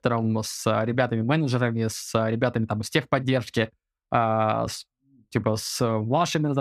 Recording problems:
abrupt cut into speech; at the end

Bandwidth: 14.5 kHz